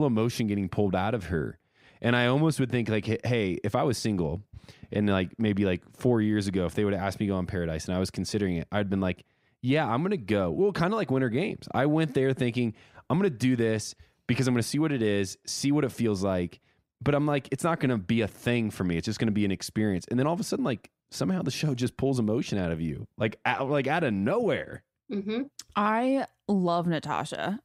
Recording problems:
abrupt cut into speech; at the start

